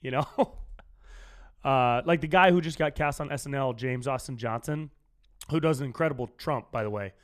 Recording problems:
none

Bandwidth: 14.5 kHz